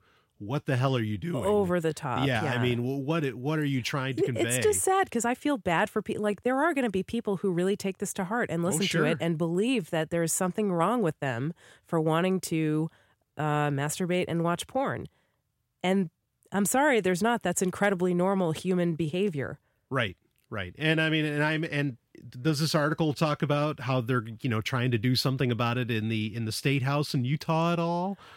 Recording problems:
none

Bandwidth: 16 kHz